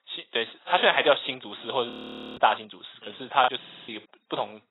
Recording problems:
garbled, watery; badly; nothing above 4 kHz
thin; very; fading below 750 Hz
audio freezing; at 2 s
choppy; occasionally; at 3.5 s; 4% of the speech affected
audio stuttering; at 3.5 s

